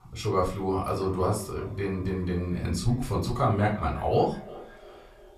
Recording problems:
off-mic speech; far
echo of what is said; faint; throughout; 350 ms later, 20 dB below the speech
room echo; very slight; dies away in 0.3 s

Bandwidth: 14.5 kHz